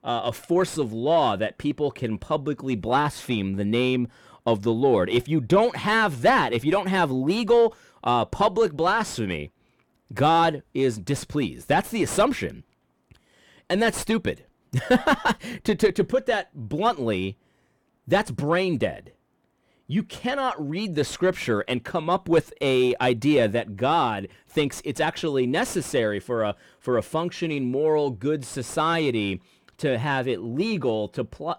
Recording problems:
distortion; slight; 10 dB below the speech

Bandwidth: 18.5 kHz